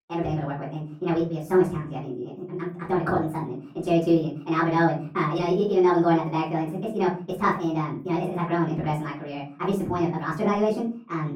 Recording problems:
off-mic speech; far
muffled; very; fading above 2.5 kHz
wrong speed and pitch; too fast and too high; 1.5 times normal speed
room echo; slight; dies away in 0.4 s

